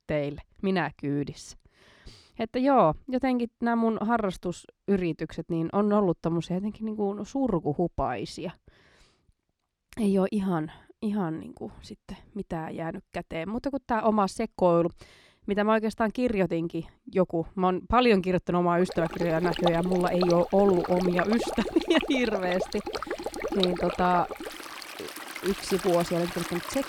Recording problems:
rain or running water; loud; from 19 s on; 7 dB below the speech

